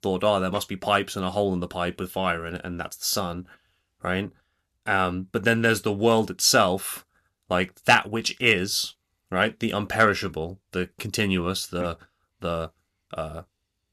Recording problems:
none

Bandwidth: 13.5 kHz